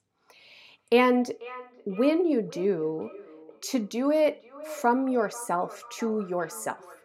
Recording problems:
echo of what is said; faint; throughout; 490 ms later, 20 dB below the speech

